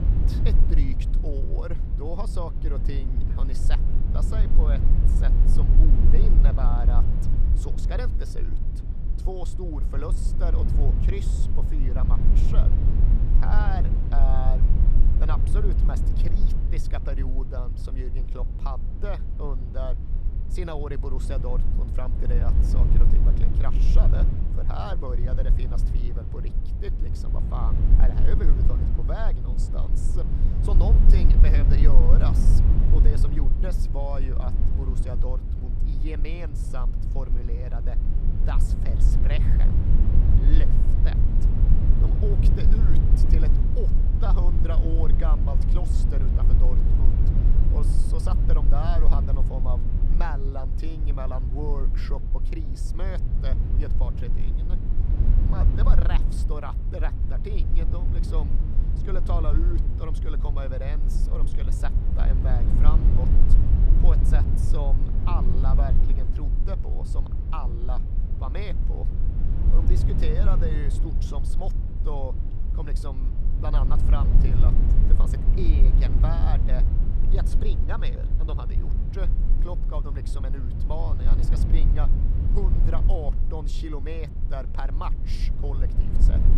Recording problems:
low rumble; loud; throughout; 3 dB below the speech

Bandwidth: 14.5 kHz